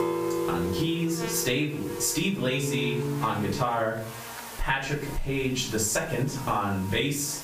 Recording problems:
off-mic speech; far
room echo; slight; dies away in 0.4 s
squashed, flat; somewhat
background music; loud; until 3.5 s; 5 dB below the speech
electrical hum; noticeable; throughout; 60 Hz, 15 dB below the speech
hiss; noticeable; throughout; 20 dB below the speech

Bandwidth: 15 kHz